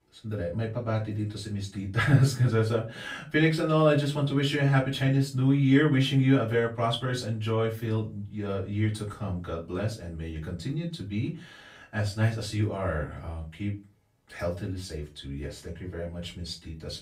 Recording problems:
off-mic speech; far
room echo; very slight; dies away in 0.2 s

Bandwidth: 15.5 kHz